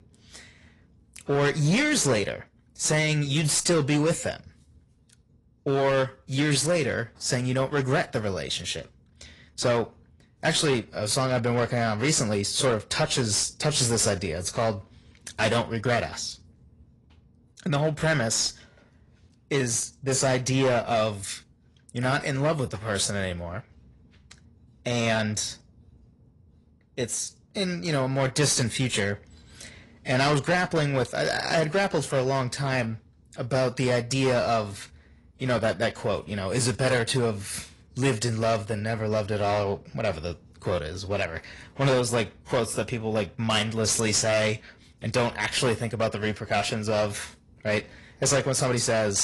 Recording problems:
distortion; slight; 8% of the sound clipped
garbled, watery; slightly; nothing above 10.5 kHz
abrupt cut into speech; at the end

